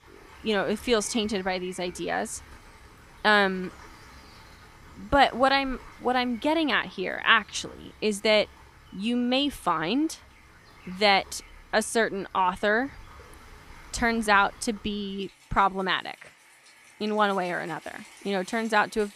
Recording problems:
rain or running water; faint; throughout; 25 dB below the speech

